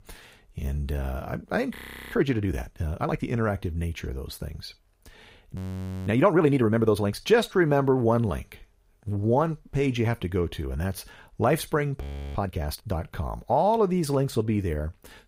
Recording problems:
audio freezing; at 2 s, at 5.5 s for 0.5 s and at 12 s

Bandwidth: 15.5 kHz